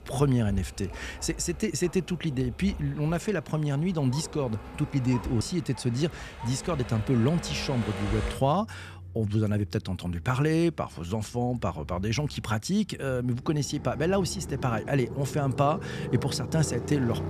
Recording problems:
traffic noise; noticeable; throughout; 10 dB below the speech

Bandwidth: 14.5 kHz